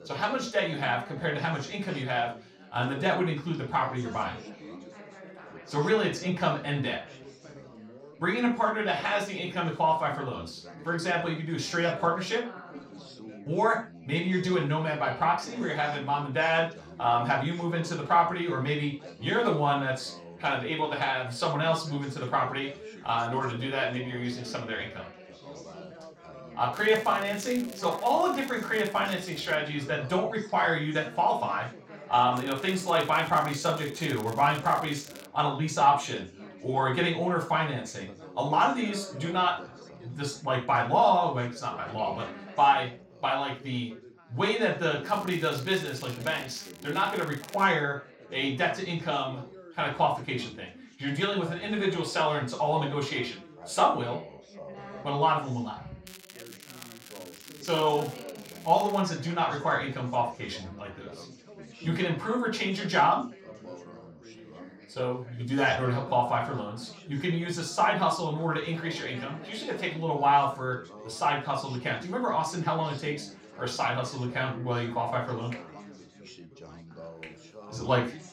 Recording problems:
off-mic speech; far
room echo; noticeable; dies away in 0.3 s
background chatter; noticeable; throughout; 4 voices, 20 dB below the speech
crackling; noticeable; 4 times, first at 27 s; 20 dB below the speech

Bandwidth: 16 kHz